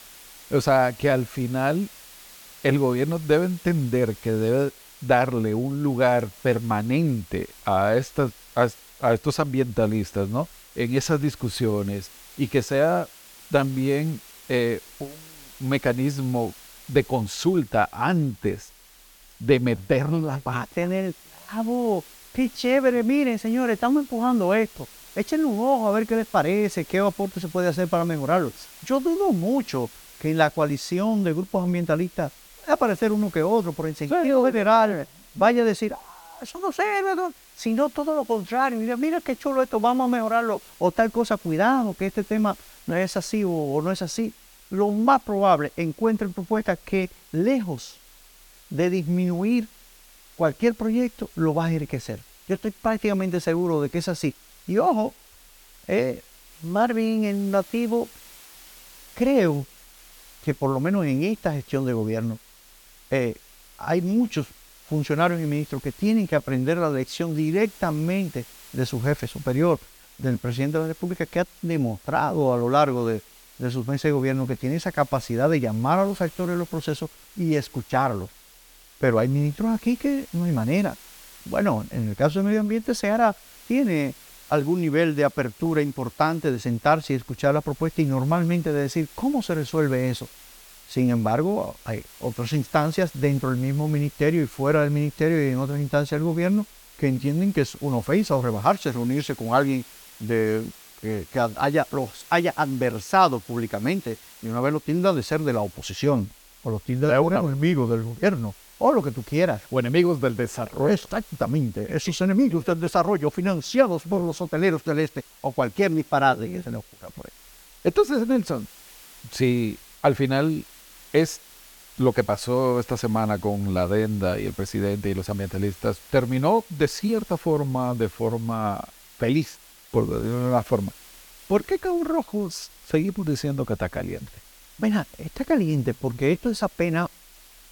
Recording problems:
hiss; faint; throughout; 20 dB below the speech

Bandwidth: 18 kHz